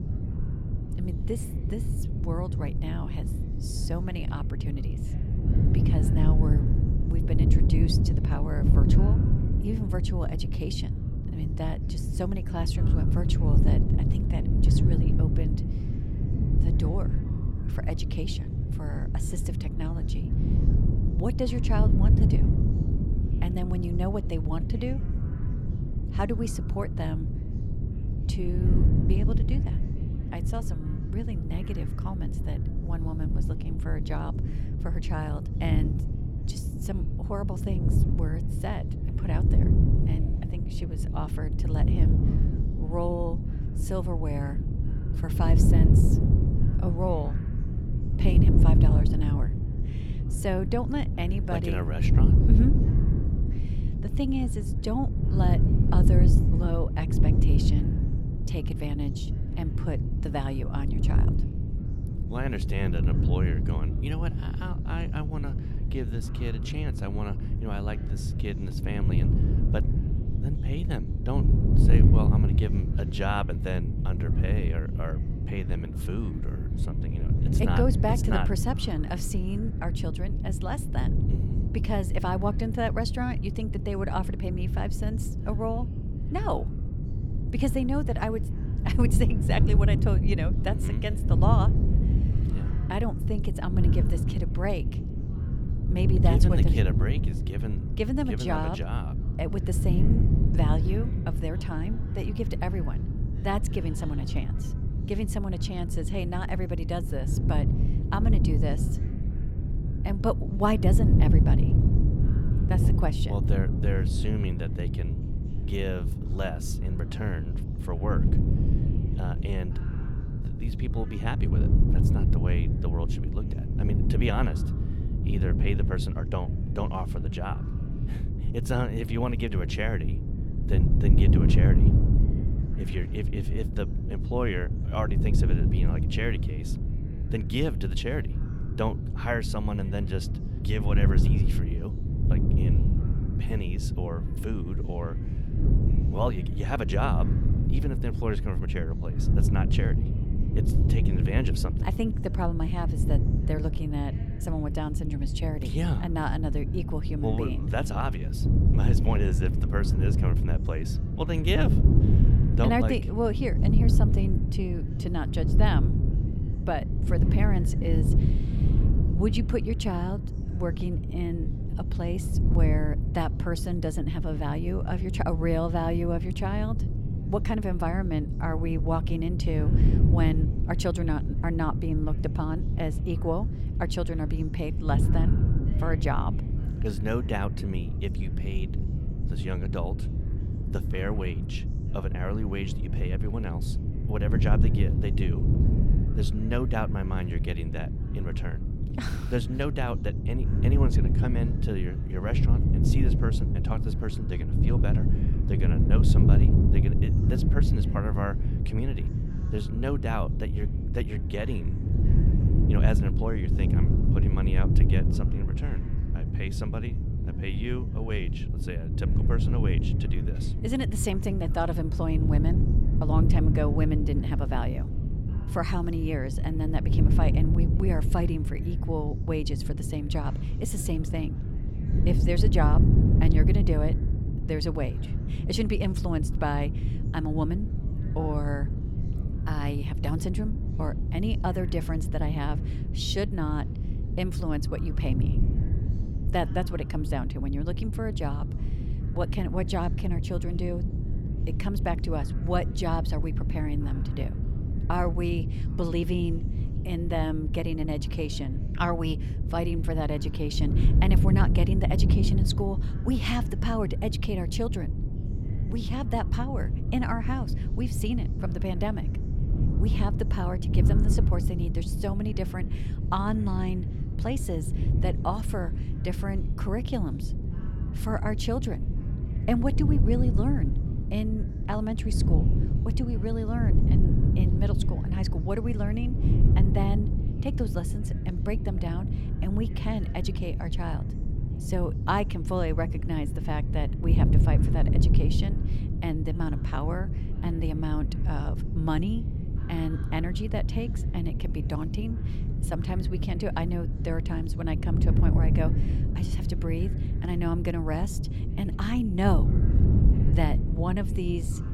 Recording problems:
wind noise on the microphone; heavy; 5 dB below the speech
chatter from many people; faint; throughout; 25 dB below the speech

